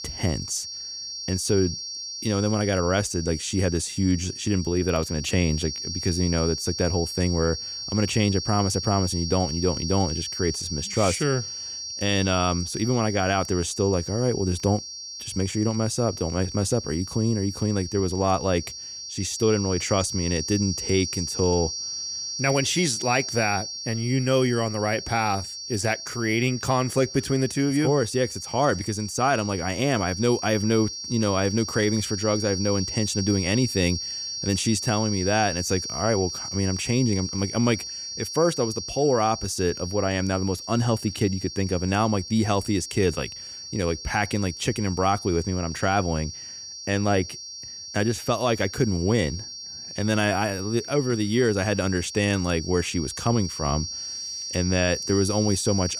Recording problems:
high-pitched whine; loud; throughout; 5.5 kHz, 7 dB below the speech

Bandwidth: 15 kHz